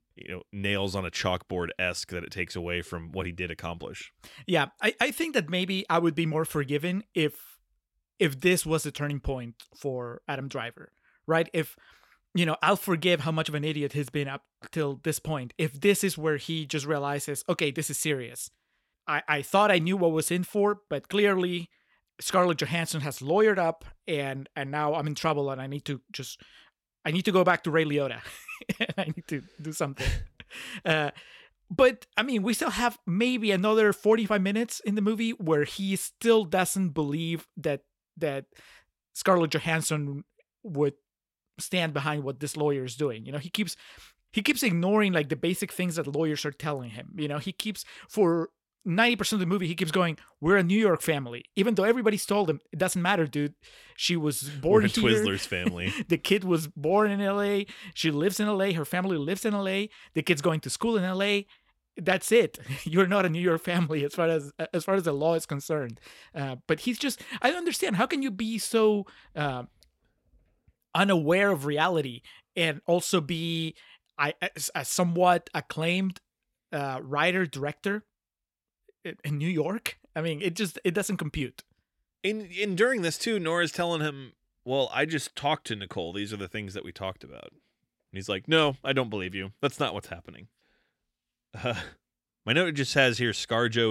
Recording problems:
abrupt cut into speech; at the end

